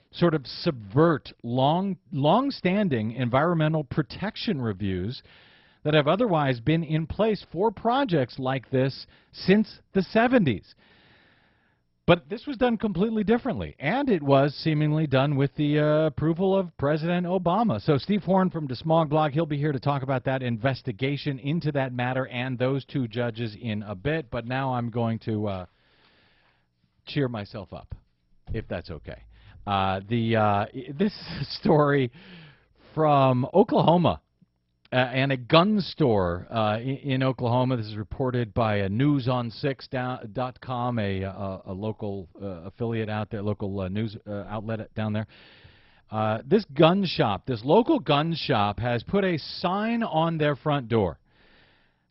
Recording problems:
garbled, watery; badly; nothing above 5.5 kHz

